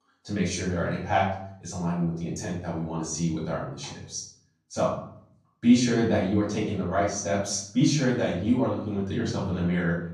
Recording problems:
off-mic speech; far
room echo; noticeable; dies away in 0.6 s

